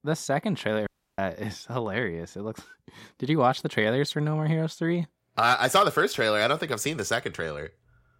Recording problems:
audio cutting out; at 1 s

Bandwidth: 16 kHz